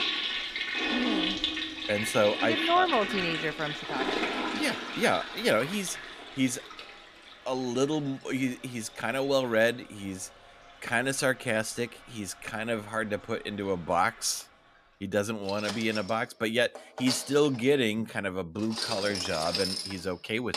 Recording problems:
household noises; loud; throughout; 2 dB below the speech

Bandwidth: 14.5 kHz